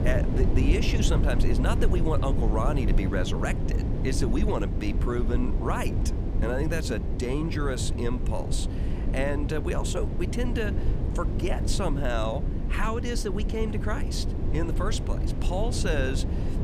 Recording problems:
low rumble; loud; throughout; 6 dB below the speech

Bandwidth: 14.5 kHz